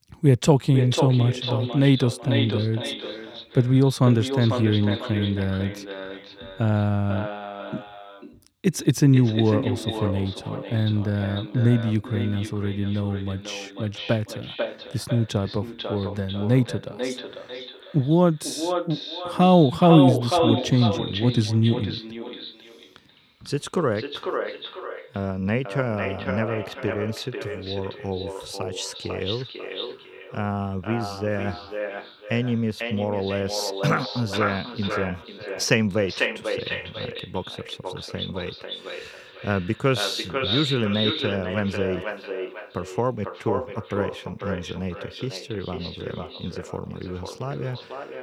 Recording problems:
echo of what is said; strong; throughout; 500 ms later, 7 dB below the speech

